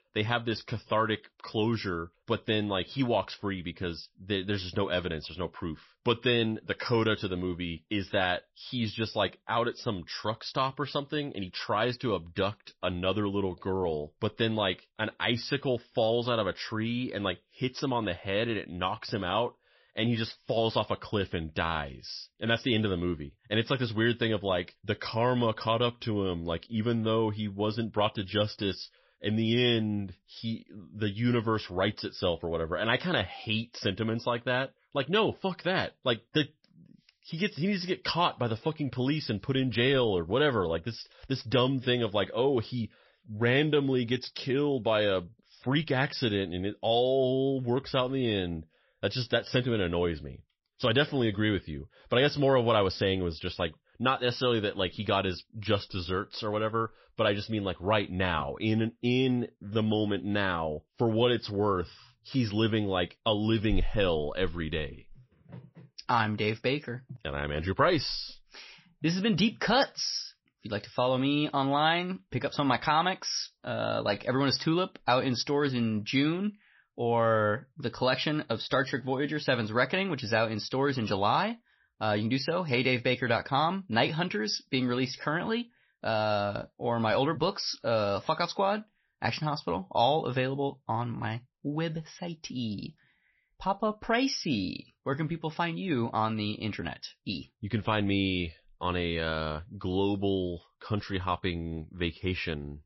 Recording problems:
garbled, watery; slightly; nothing above 5.5 kHz

